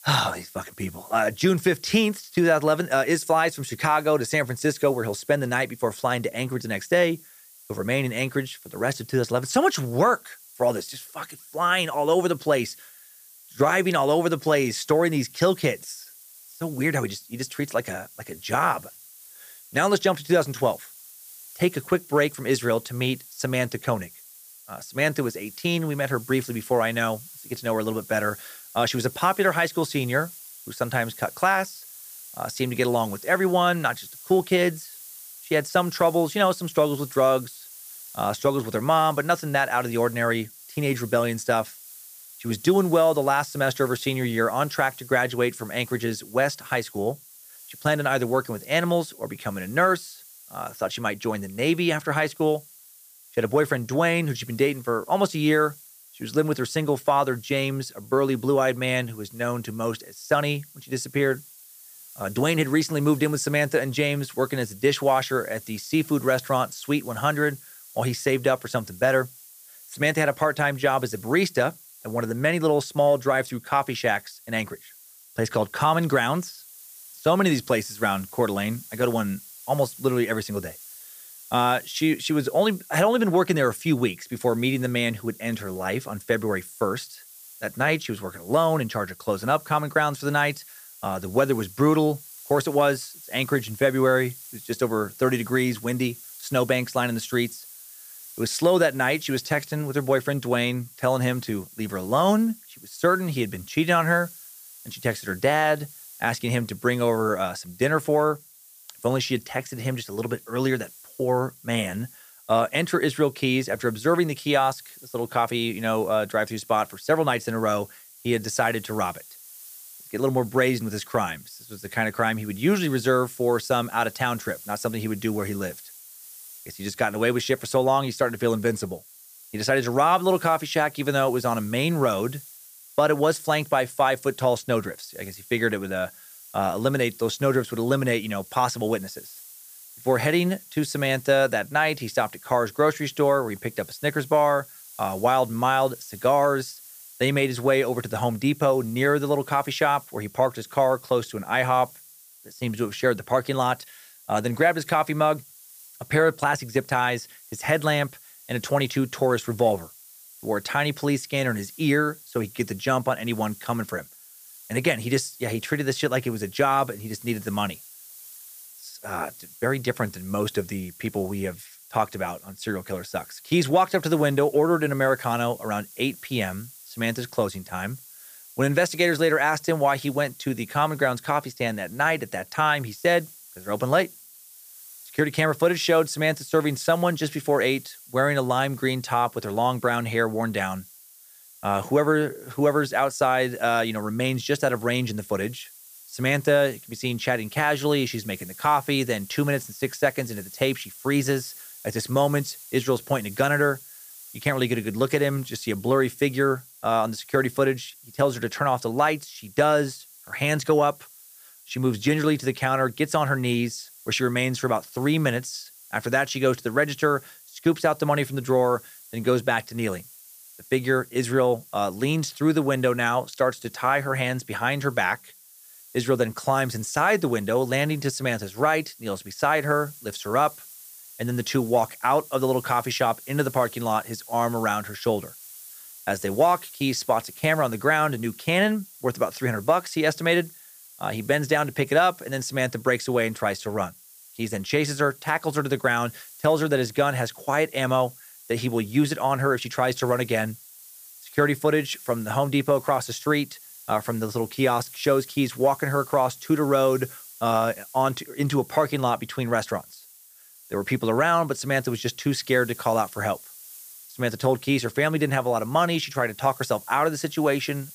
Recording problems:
hiss; noticeable; throughout; 20 dB below the speech

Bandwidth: 15 kHz